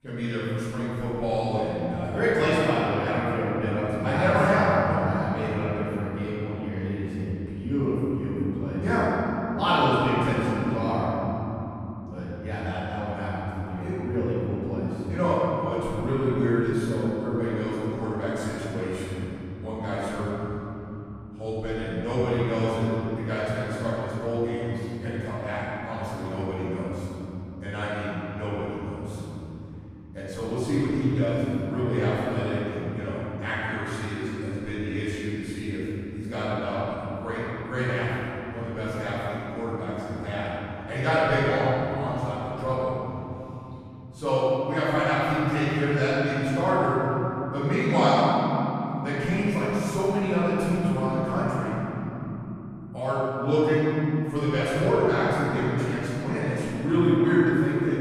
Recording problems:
room echo; strong; dies away in 3 s
off-mic speech; far

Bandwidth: 15 kHz